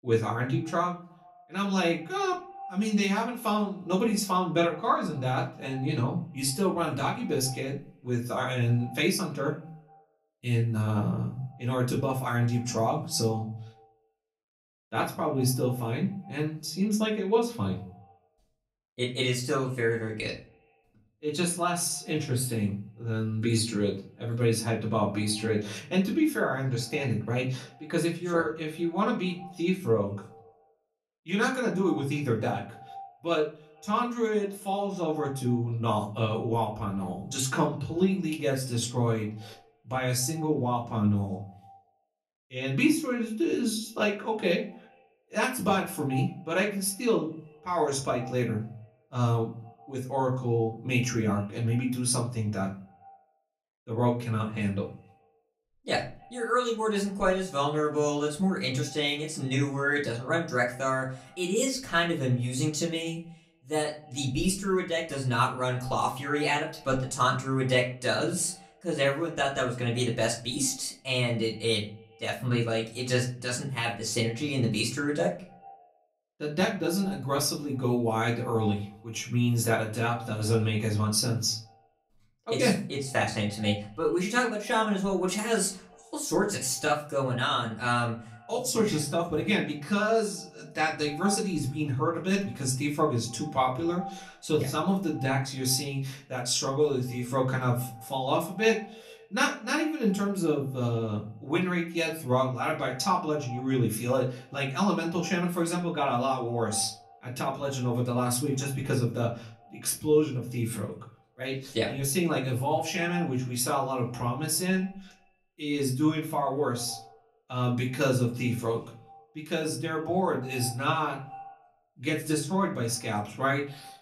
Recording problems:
off-mic speech; far
echo of what is said; faint; throughout; 140 ms later, 20 dB below the speech
room echo; very slight; dies away in 0.3 s

